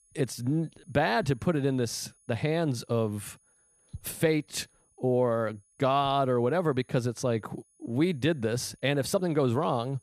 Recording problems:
high-pitched whine; faint; throughout; 10 kHz, 35 dB below the speech

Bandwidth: 14.5 kHz